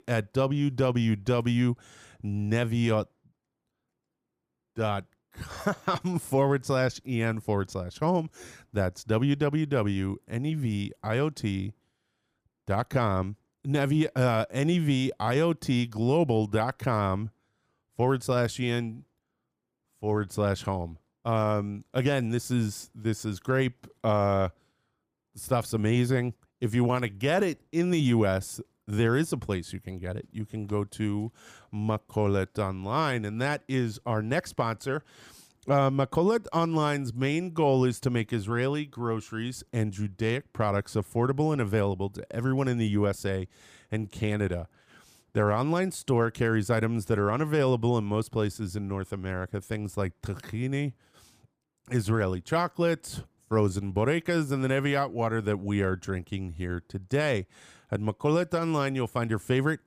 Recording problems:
none

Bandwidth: 15 kHz